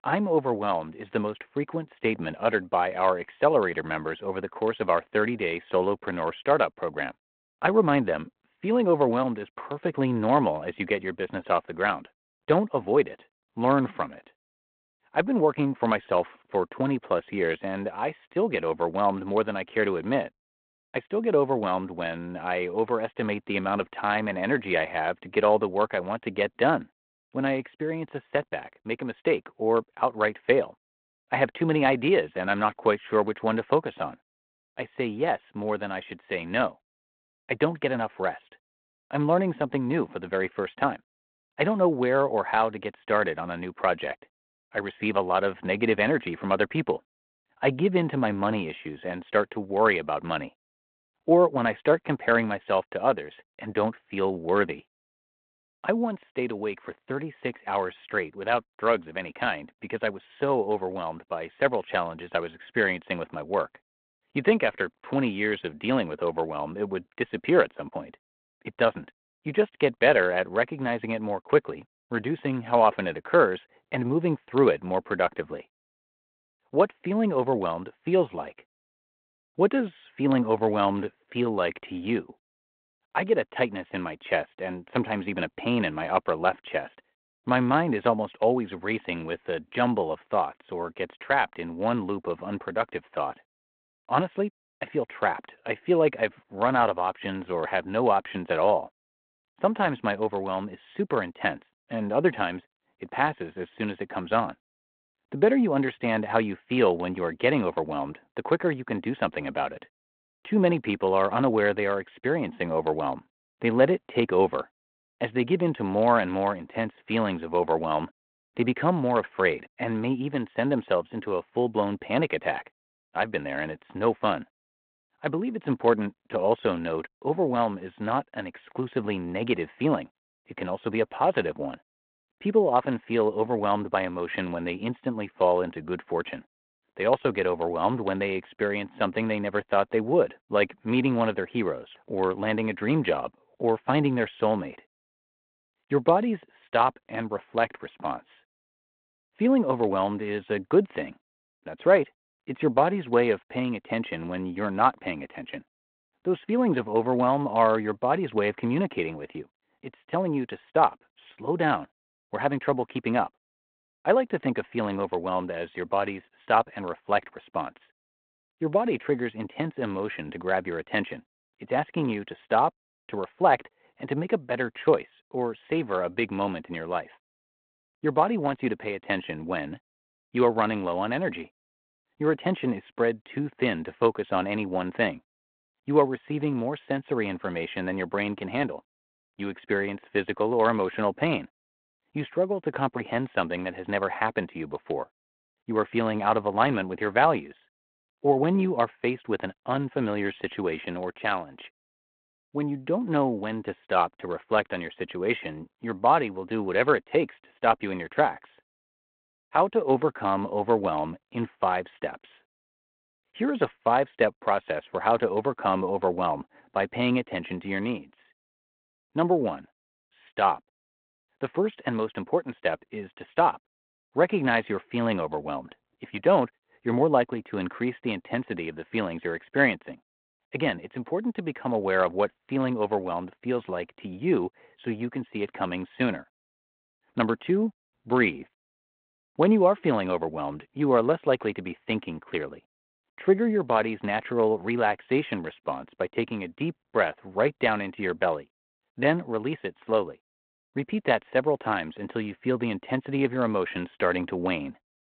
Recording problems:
phone-call audio; nothing above 4 kHz

